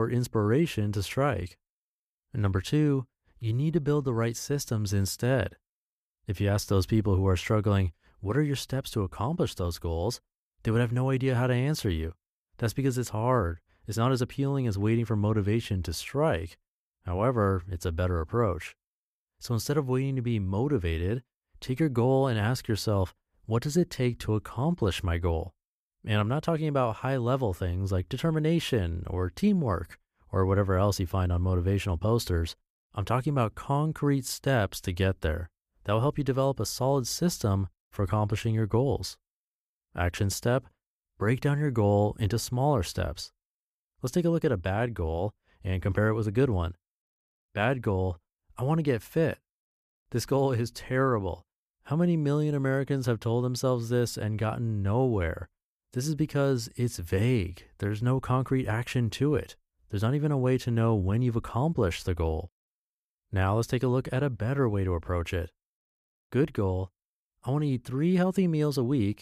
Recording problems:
abrupt cut into speech; at the start

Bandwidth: 14.5 kHz